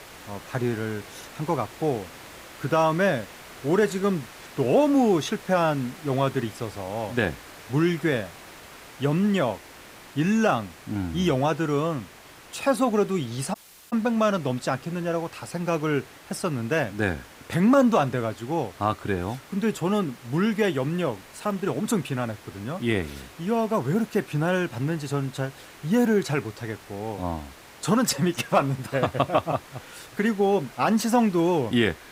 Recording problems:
hiss; noticeable; throughout; 20 dB below the speech
audio cutting out; at 14 s

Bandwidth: 15.5 kHz